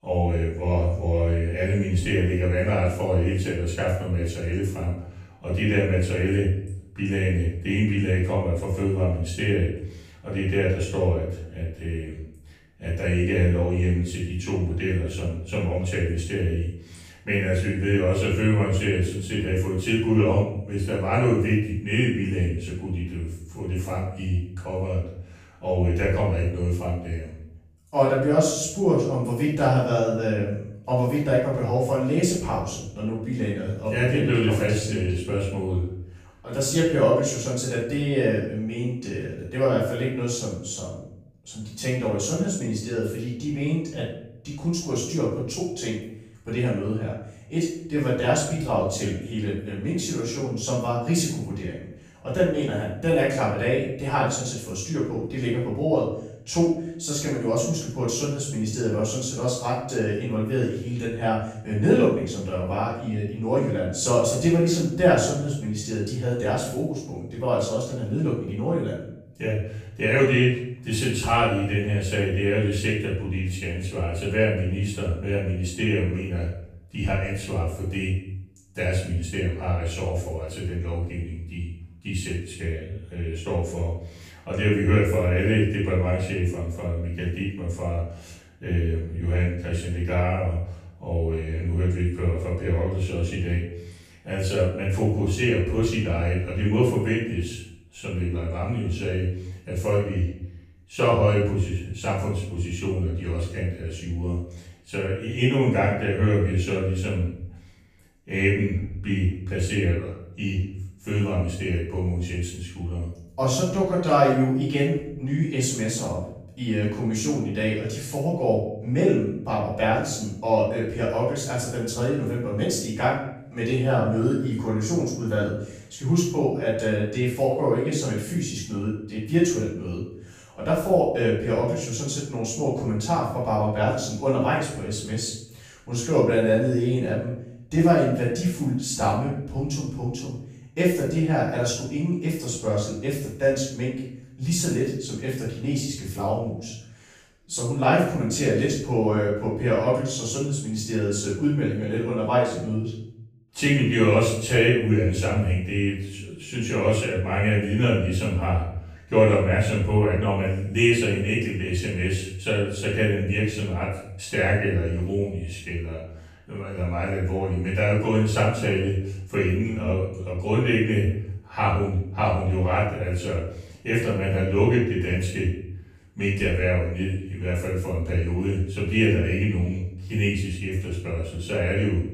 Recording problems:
off-mic speech; far
room echo; noticeable; dies away in 0.7 s

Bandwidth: 15 kHz